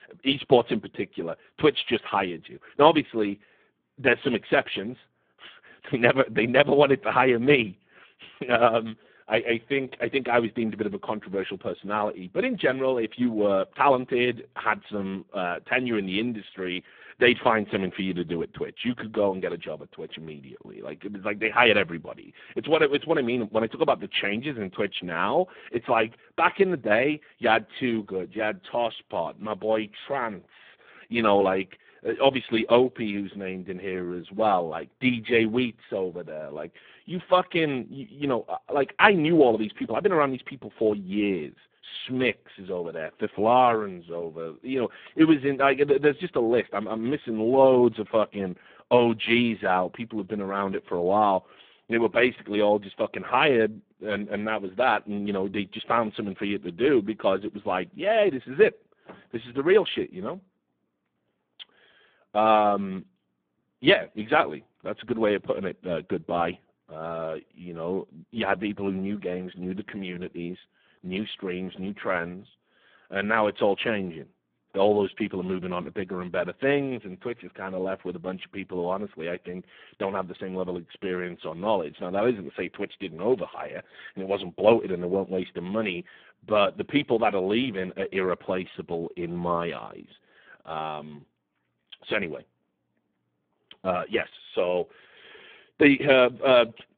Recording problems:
phone-call audio; poor line

